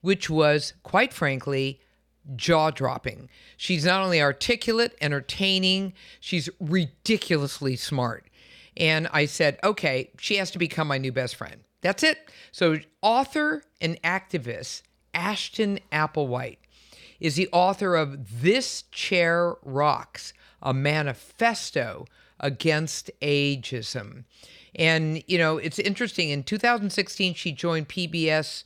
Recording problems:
none

